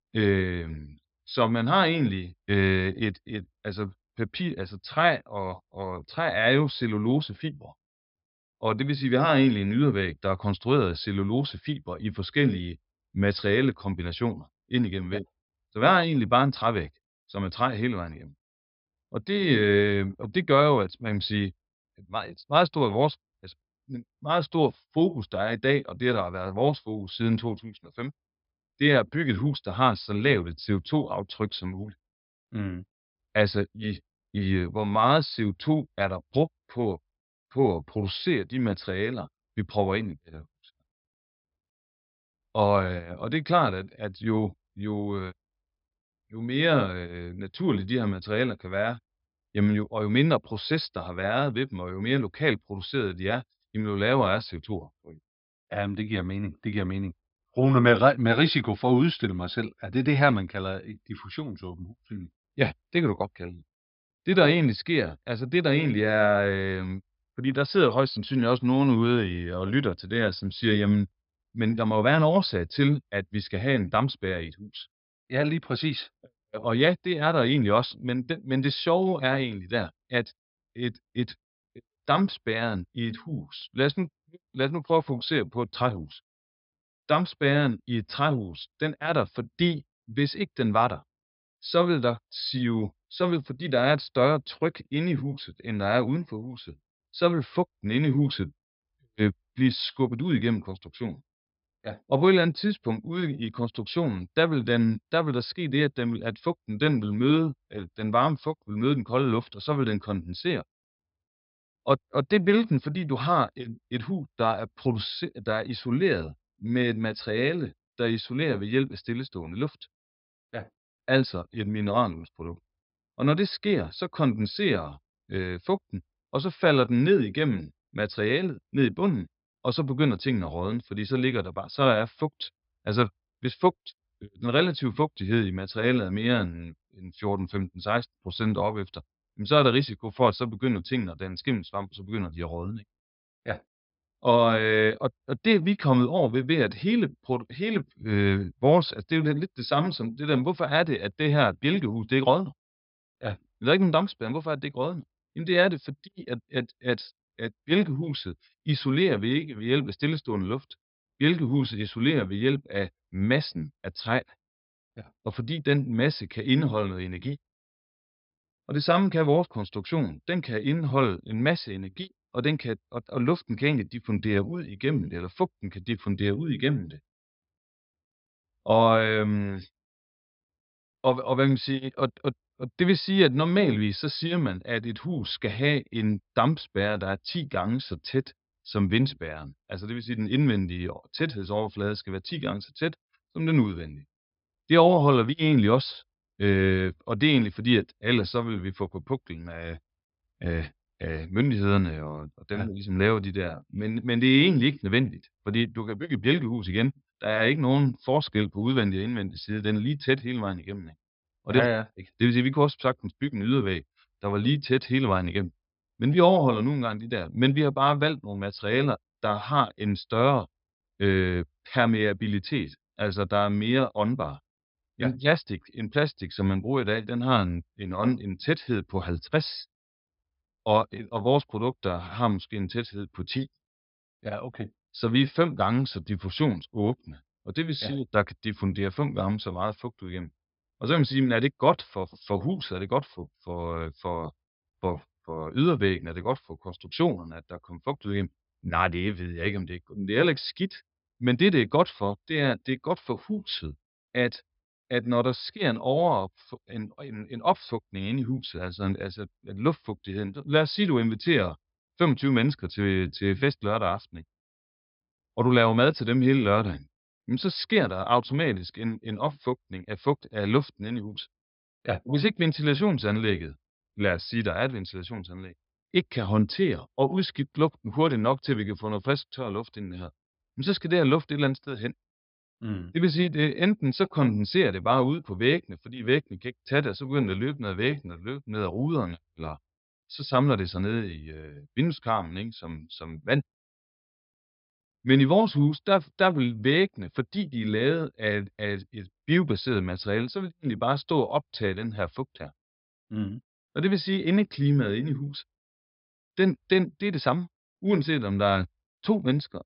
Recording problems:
high frequencies cut off; noticeable; nothing above 5.5 kHz

